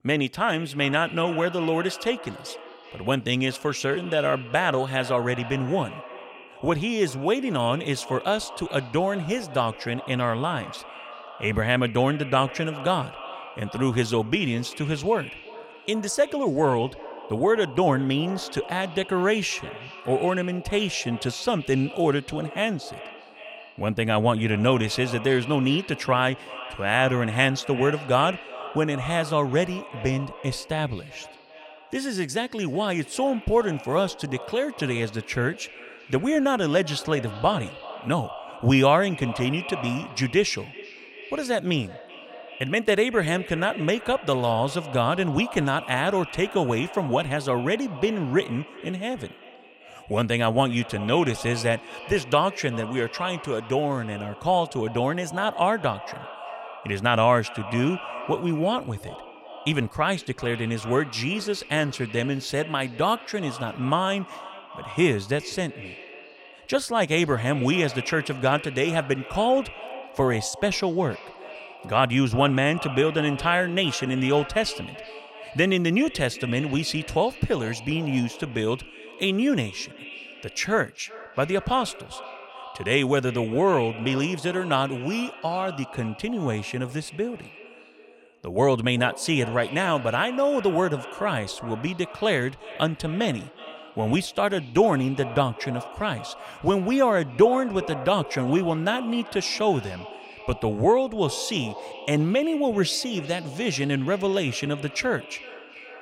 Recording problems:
echo of what is said; noticeable; throughout; 380 ms later, 15 dB below the speech

